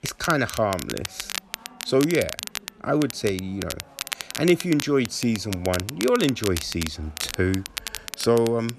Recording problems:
crackle, like an old record; loud; 9 dB below the speech
chatter from many people; faint; throughout; 25 dB below the speech

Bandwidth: 13.5 kHz